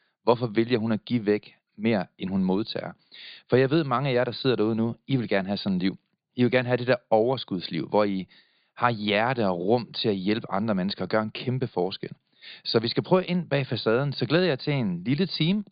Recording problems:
high frequencies cut off; severe; nothing above 5 kHz

